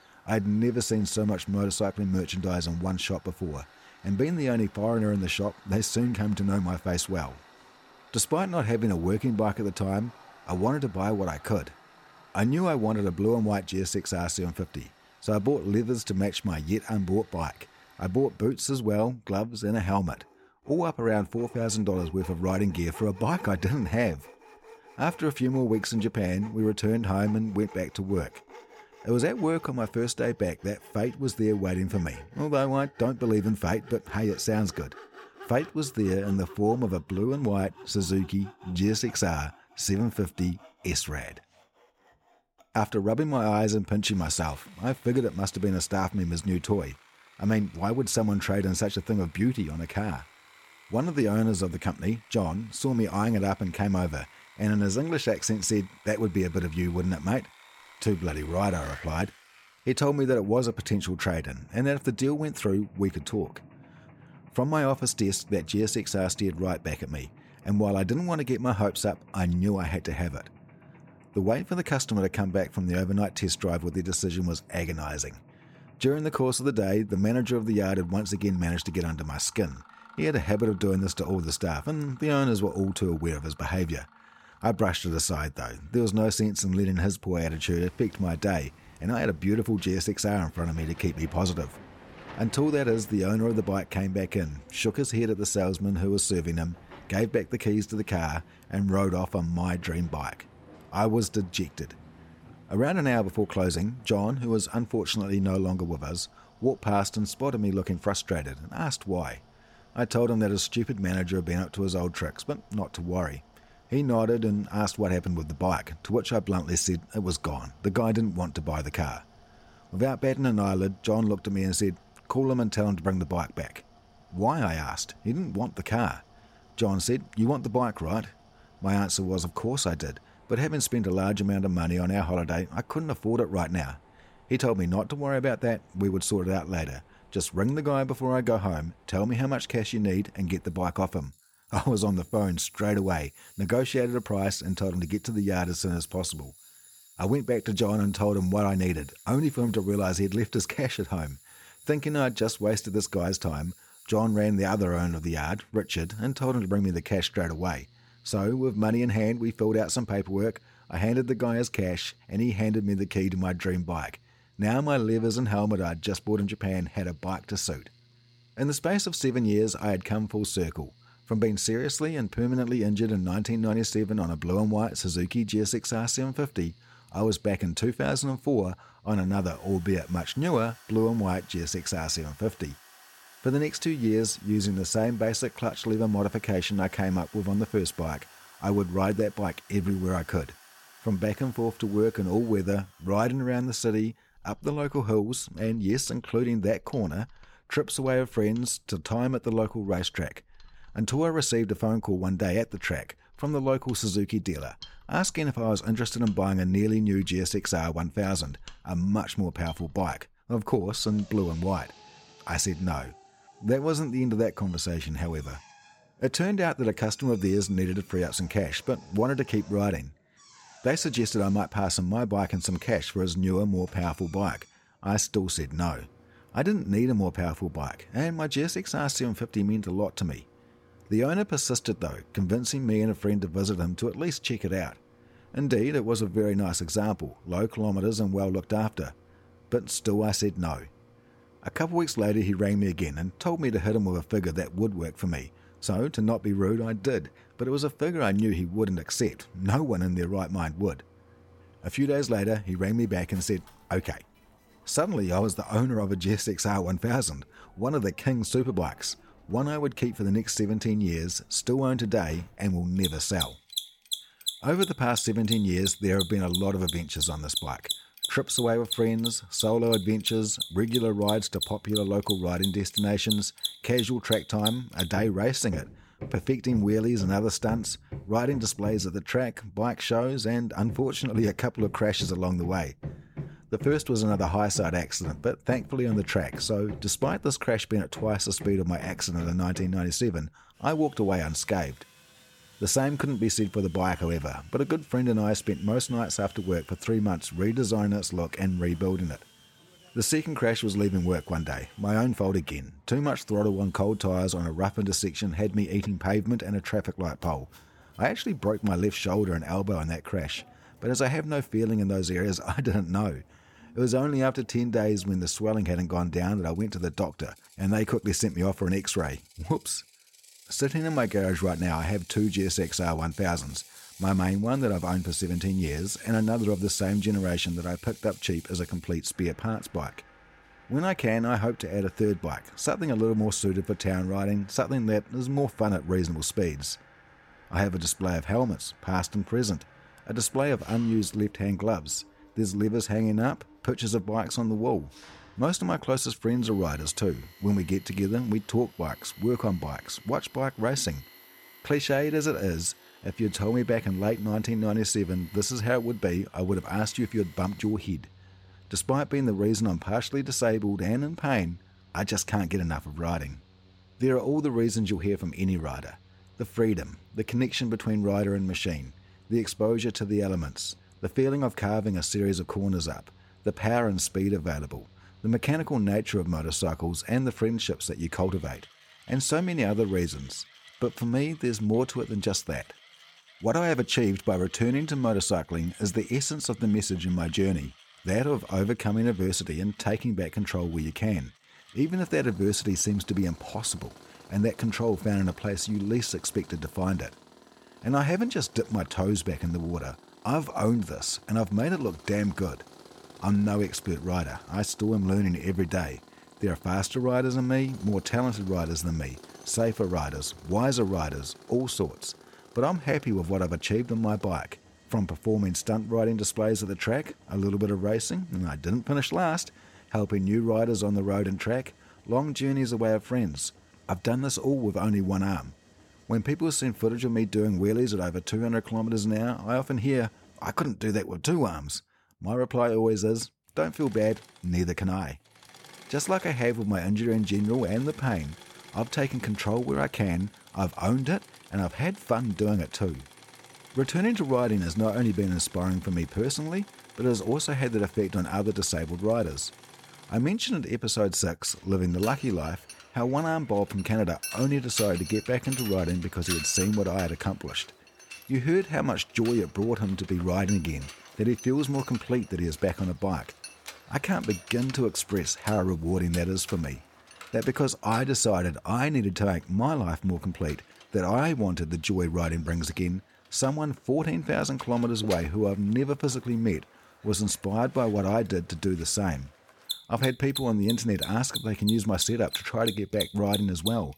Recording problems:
machinery noise; noticeable; throughout; 15 dB below the speech

